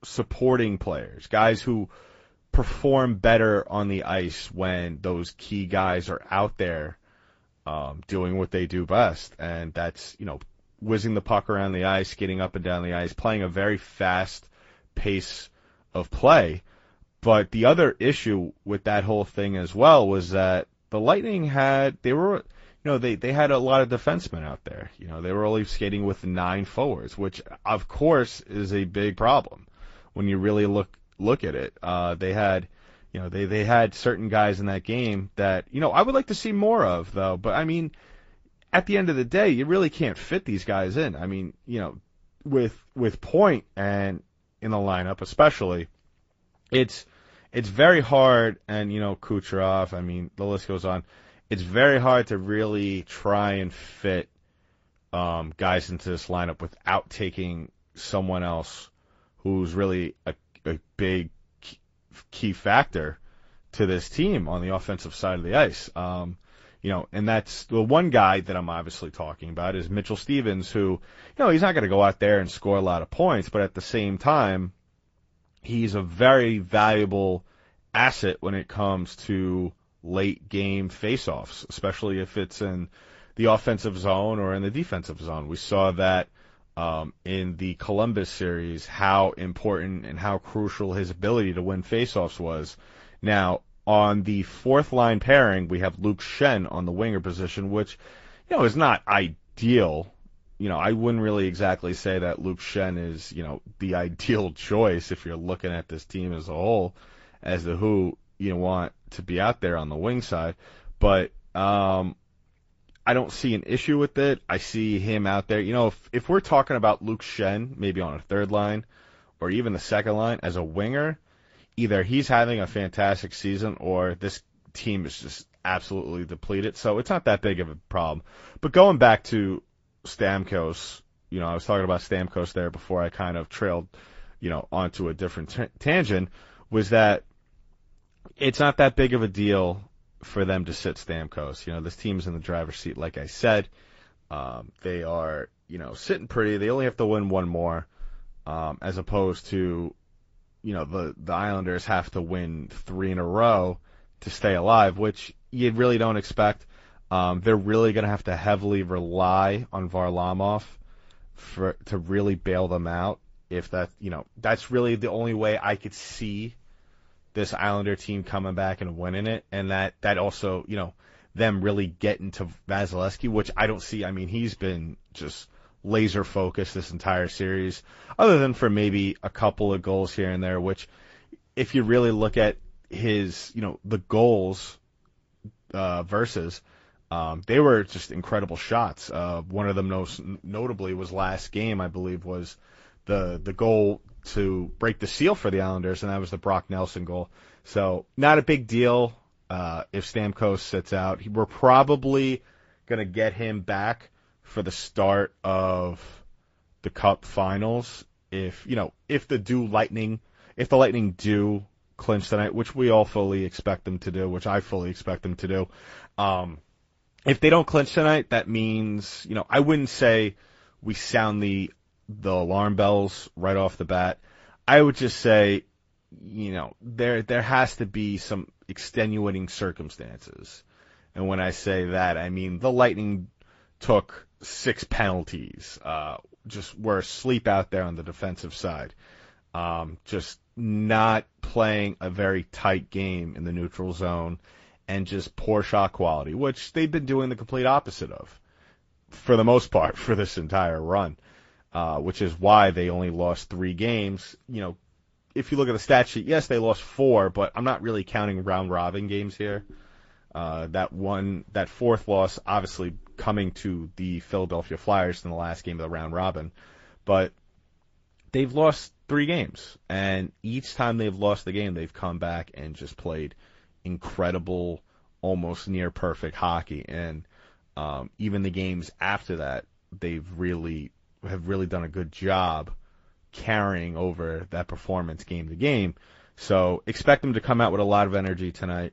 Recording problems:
high frequencies cut off; noticeable; nothing above 7.5 kHz
garbled, watery; slightly

